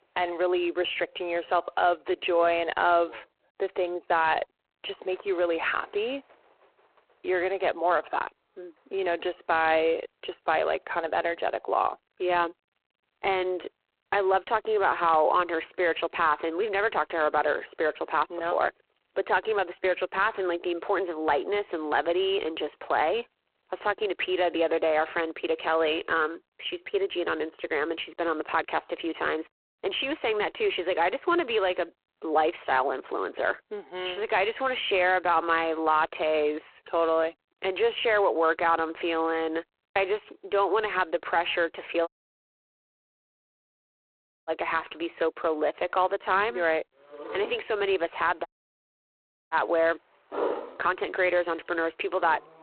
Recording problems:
phone-call audio; poor line
animal sounds; noticeable; throughout; 15 dB below the speech
audio cutting out; at 42 s for 2.5 s and at 48 s for 1 s

